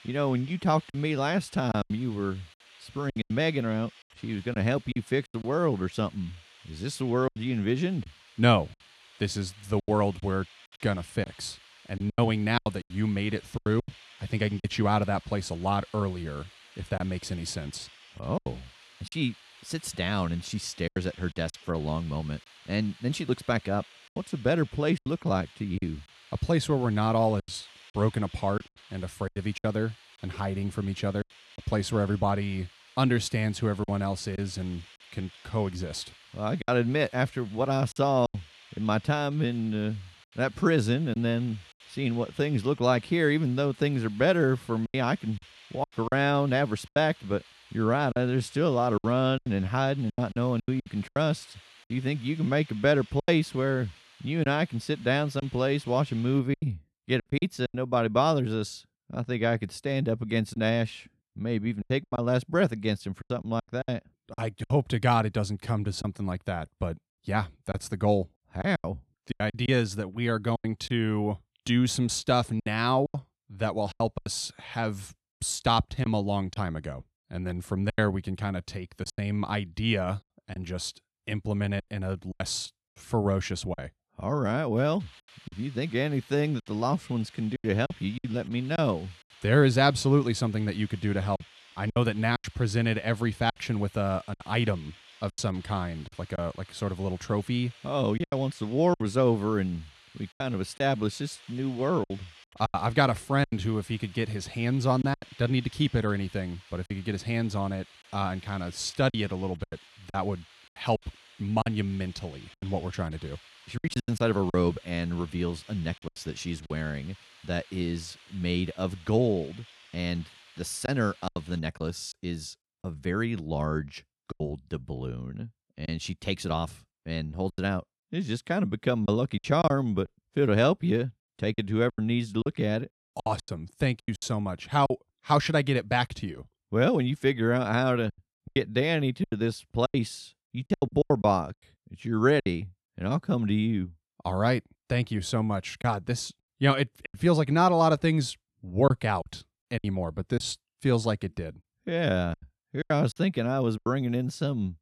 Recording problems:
hiss; faint; until 56 s and from 1:25 to 2:02; 25 dB below the speech
choppy; very; 7% of the speech affected

